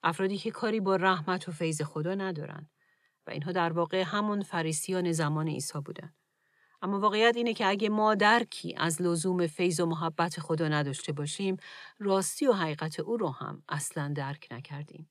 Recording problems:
none

